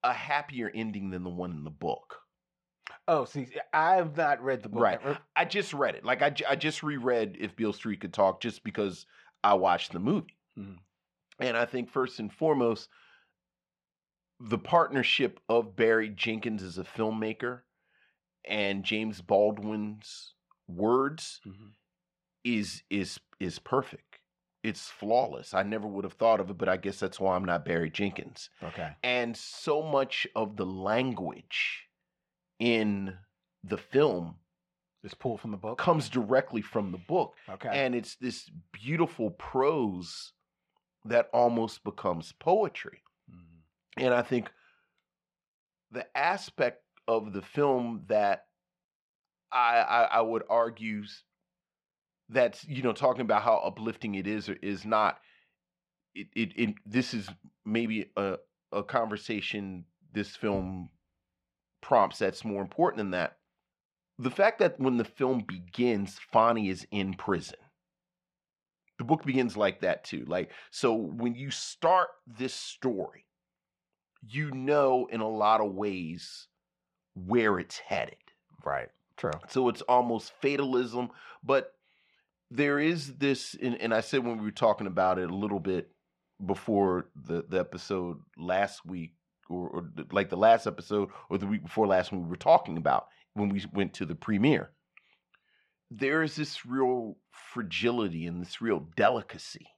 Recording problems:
muffled; very; fading above 3 kHz

